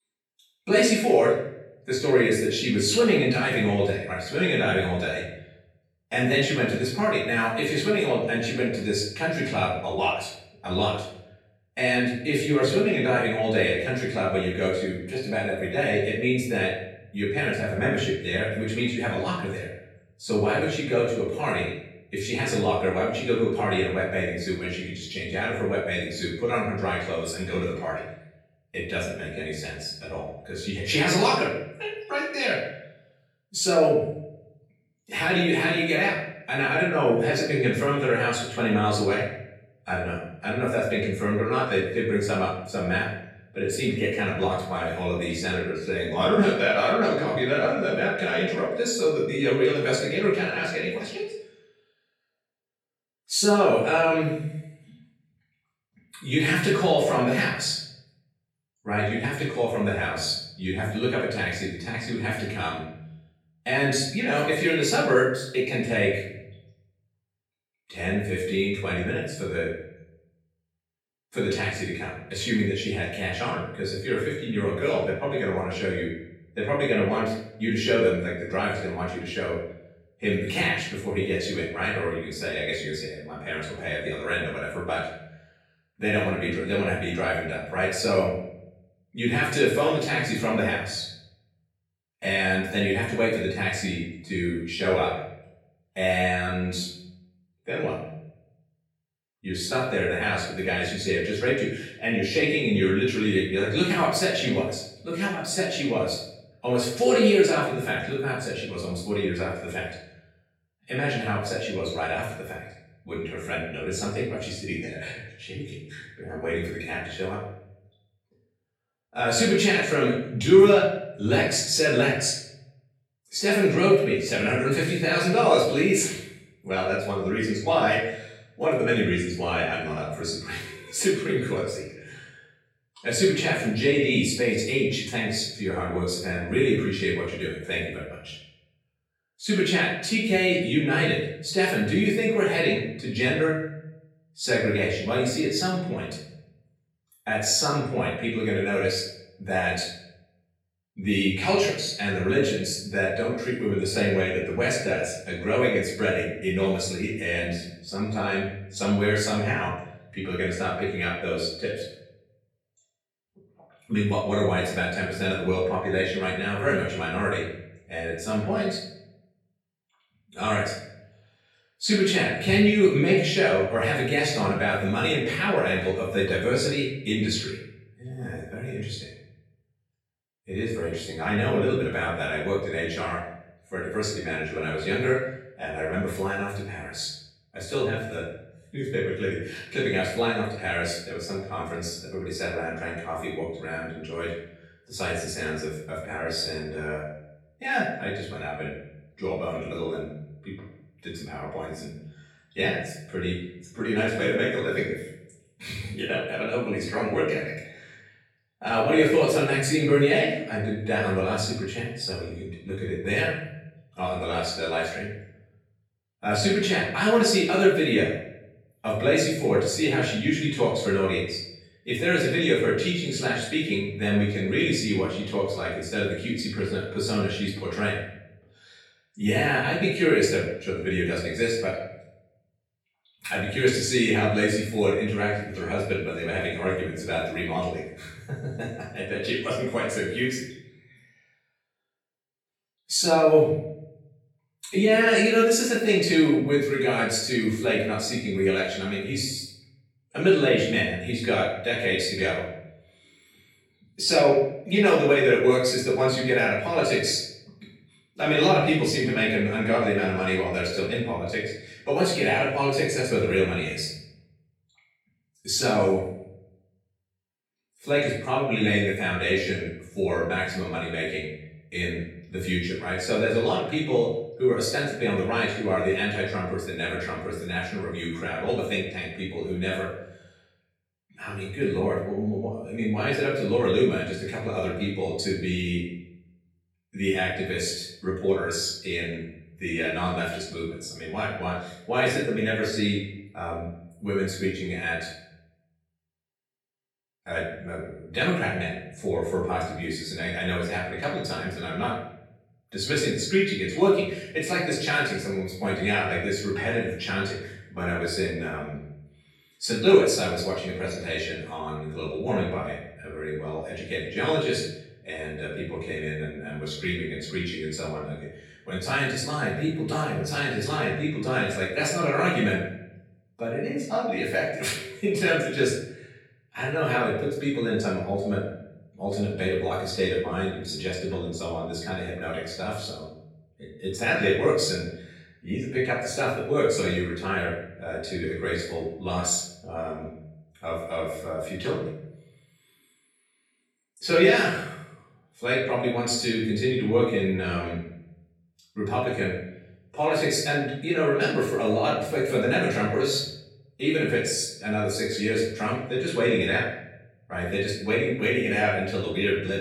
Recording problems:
off-mic speech; far
room echo; noticeable; dies away in 0.7 s

